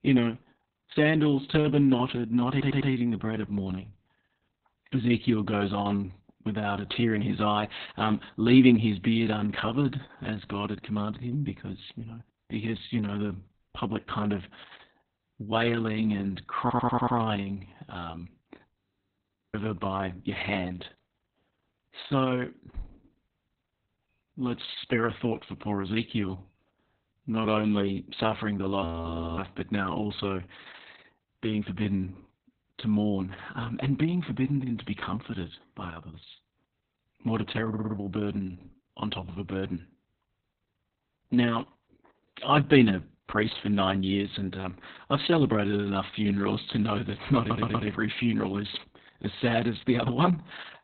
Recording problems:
garbled, watery; badly; nothing above 4 kHz
audio stuttering; 4 times, first at 2.5 s
audio freezing; at 19 s for 1 s and at 29 s for 0.5 s

